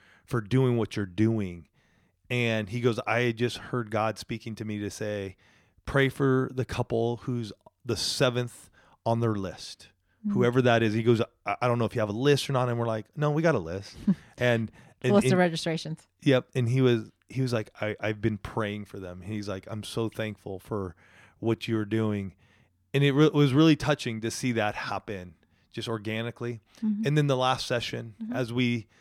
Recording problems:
none

